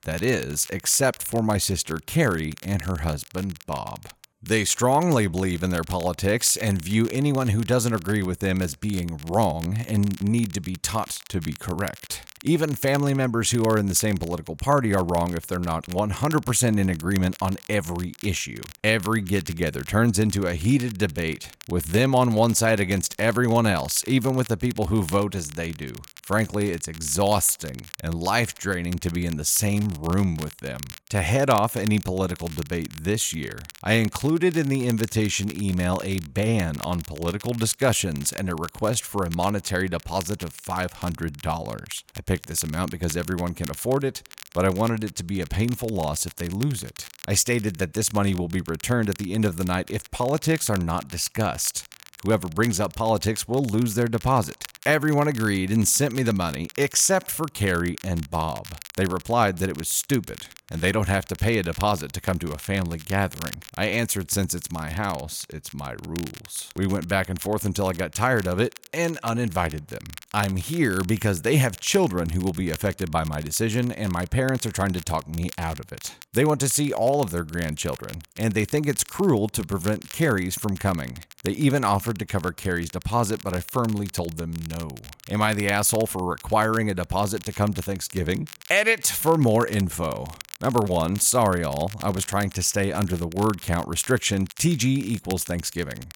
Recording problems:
crackle, like an old record; noticeable; 20 dB below the speech

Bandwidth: 17 kHz